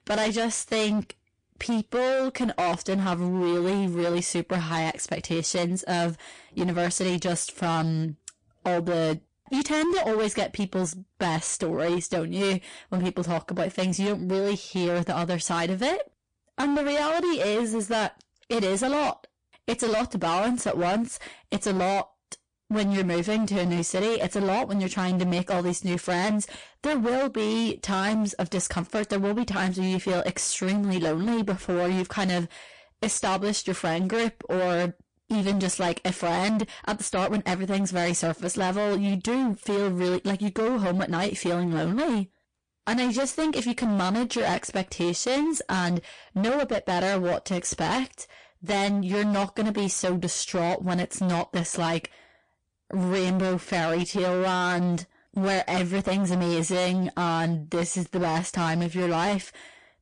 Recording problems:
distortion; heavy; 26% of the sound clipped
garbled, watery; slightly; nothing above 8.5 kHz

